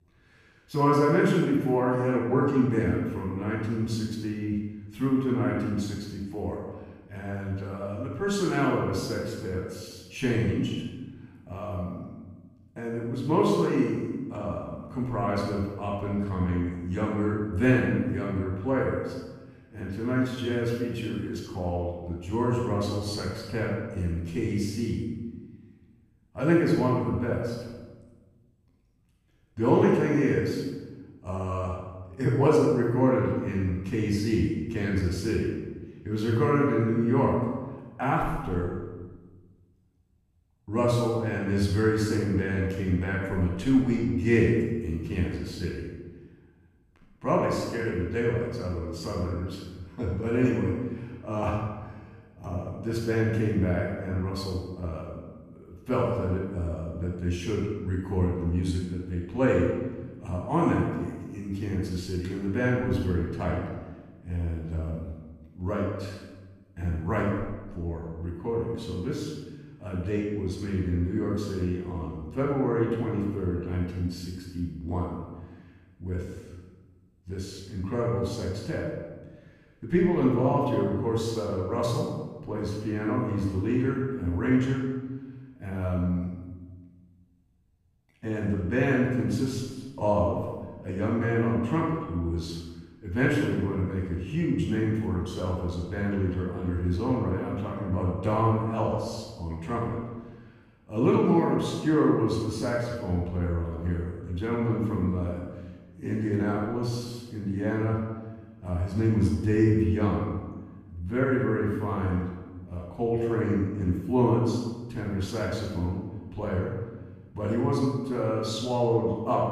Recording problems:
room echo; strong; dies away in 1.2 s
off-mic speech; far

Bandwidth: 15 kHz